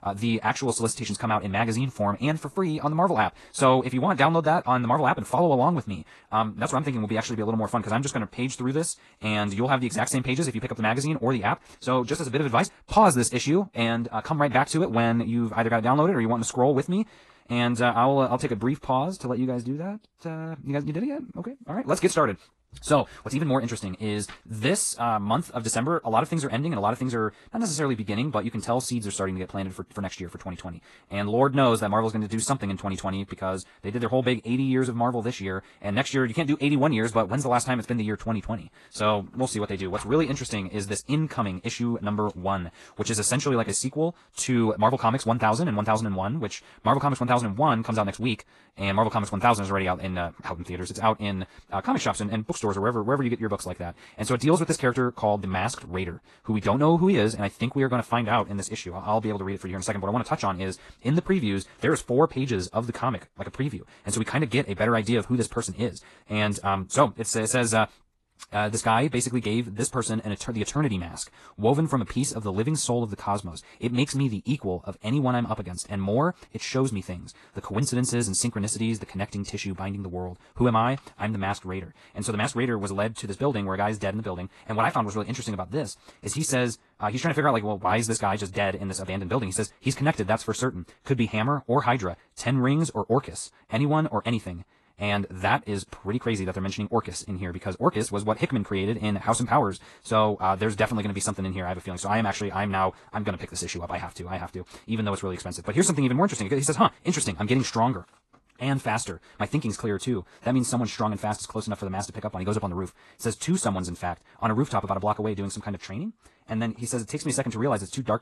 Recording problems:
wrong speed, natural pitch; too fast; 1.6 times normal speed
garbled, watery; slightly

